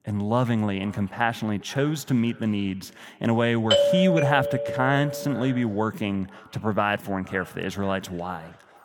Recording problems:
echo of what is said; faint; throughout; 470 ms later, 25 dB below the speech
doorbell; loud; from 3.5 to 5.5 s; peak 6 dB above the speech

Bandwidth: 18.5 kHz